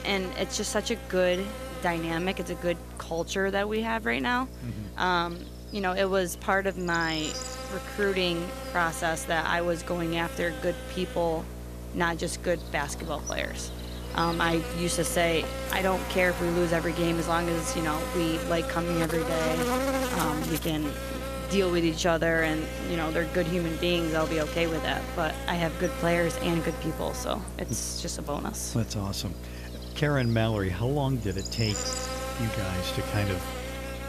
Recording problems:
electrical hum; loud; throughout; 60 Hz, 7 dB below the speech

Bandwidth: 14.5 kHz